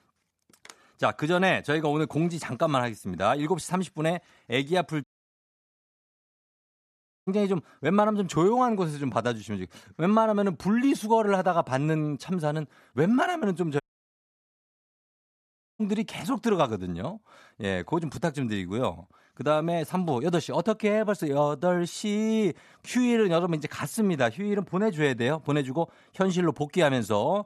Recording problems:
audio cutting out; at 5 s for 2 s and at 14 s for 2 s

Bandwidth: 13.5 kHz